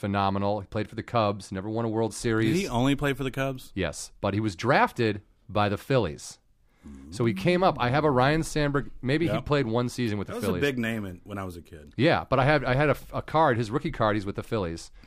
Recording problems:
none

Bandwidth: 15 kHz